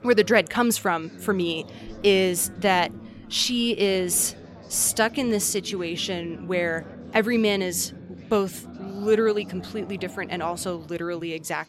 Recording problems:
background chatter; noticeable; throughout; 4 voices, 15 dB below the speech

